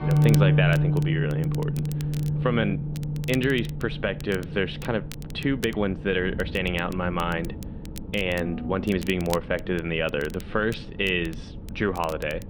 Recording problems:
muffled; slightly; fading above 3.5 kHz
background music; very loud; throughout; 1 dB above the speech
low rumble; noticeable; throughout; 20 dB below the speech
crackle, like an old record; noticeable; 20 dB below the speech
uneven, jittery; strongly; from 1 to 9 s

